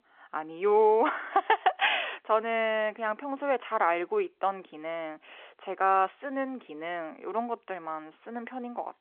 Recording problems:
phone-call audio; nothing above 3.5 kHz

